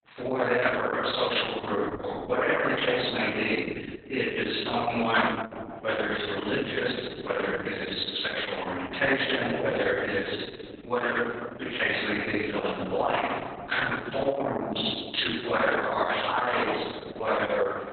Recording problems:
room echo; strong; dies away in 1.9 s
off-mic speech; far
garbled, watery; badly; nothing above 4 kHz
thin; somewhat; fading below 1 kHz

